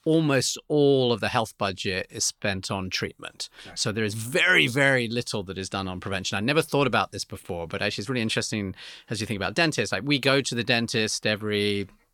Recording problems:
none

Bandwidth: 18 kHz